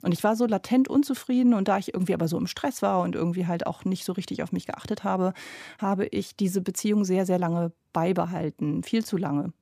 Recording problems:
none

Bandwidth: 15 kHz